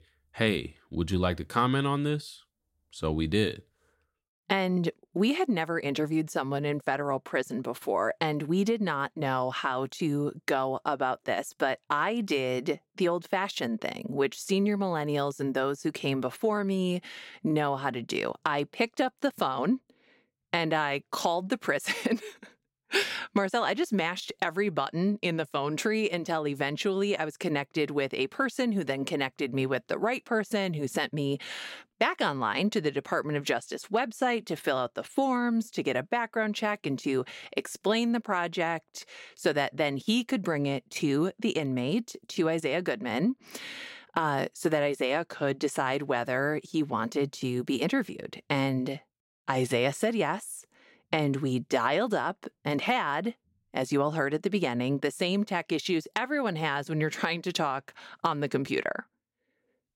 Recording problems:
none

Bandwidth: 16 kHz